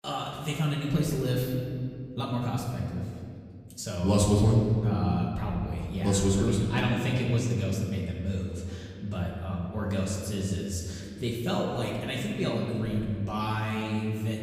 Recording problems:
off-mic speech; far
room echo; noticeable; dies away in 2.2 s

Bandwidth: 15 kHz